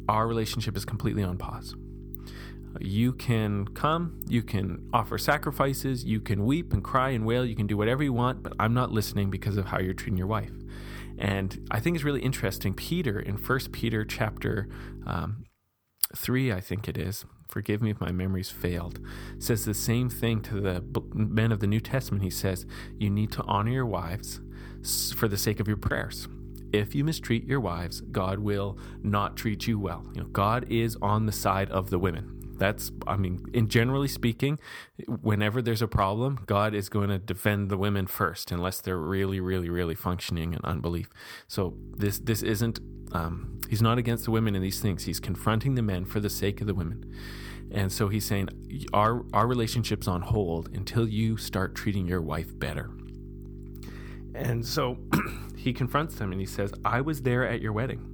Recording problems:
electrical hum; faint; until 15 s, from 19 to 34 s and from 42 s on; 50 Hz, 20 dB below the speech

